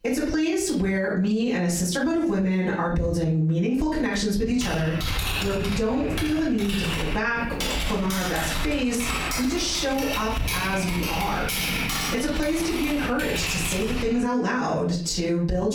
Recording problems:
off-mic speech; far
room echo; slight; dies away in 0.4 s
squashed, flat; somewhat
electrical hum; faint; from 5 to 11 s; 60 Hz, 25 dB below the speech
keyboard typing; loud; from 4.5 to 14 s; peak 1 dB above the speech
abrupt cut into speech; at the end

